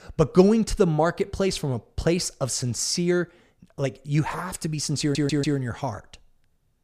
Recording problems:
audio stuttering; at 5 s

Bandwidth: 15 kHz